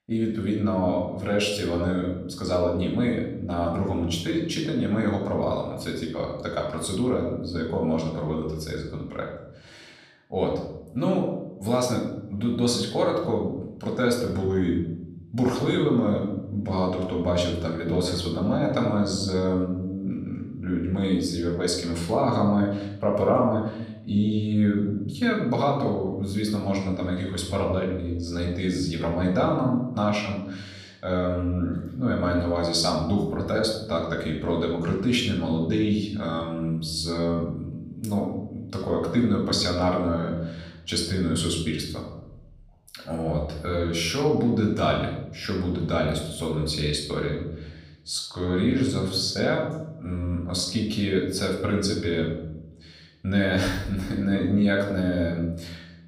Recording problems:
room echo; noticeable; dies away in 0.9 s
off-mic speech; somewhat distant

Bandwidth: 15 kHz